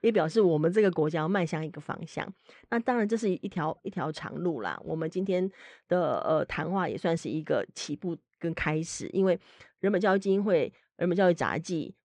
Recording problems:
muffled; slightly; fading above 3.5 kHz

